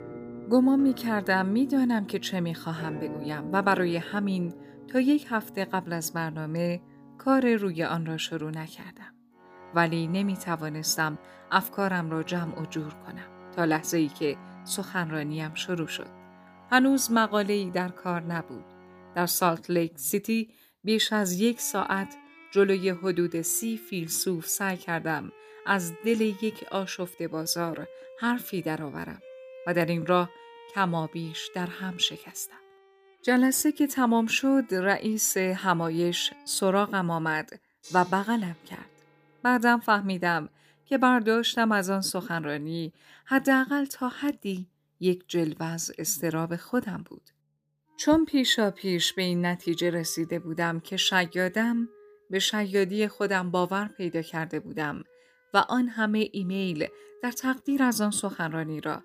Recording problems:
background music; faint; throughout; 20 dB below the speech

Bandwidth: 15 kHz